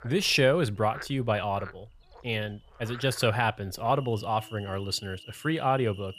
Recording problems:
animal sounds; noticeable; throughout; 20 dB below the speech

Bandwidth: 14.5 kHz